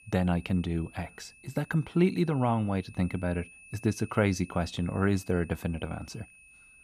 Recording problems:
high-pitched whine; faint; throughout; 2.5 kHz, 20 dB below the speech

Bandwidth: 15 kHz